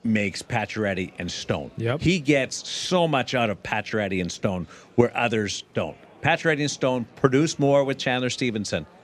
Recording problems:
murmuring crowd; faint; throughout; 30 dB below the speech

